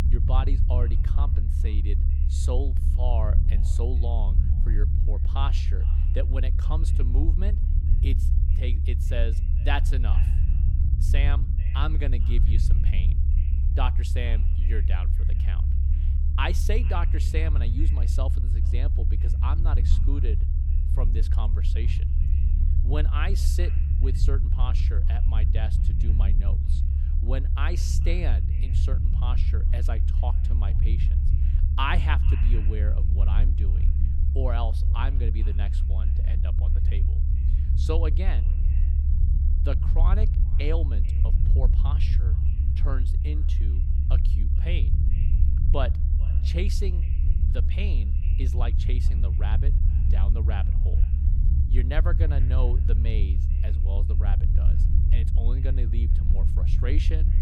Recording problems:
echo of what is said; faint; throughout; 440 ms later, 20 dB below the speech
low rumble; loud; throughout; 5 dB below the speech

